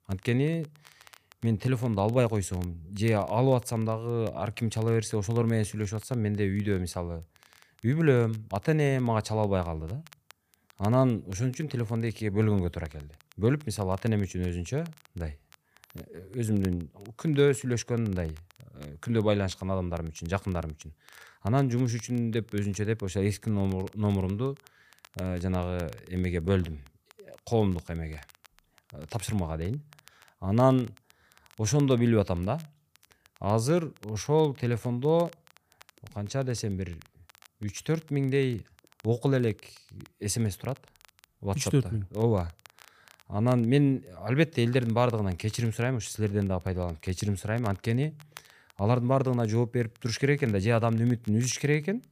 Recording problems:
crackle, like an old record; faint; 30 dB below the speech

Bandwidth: 15 kHz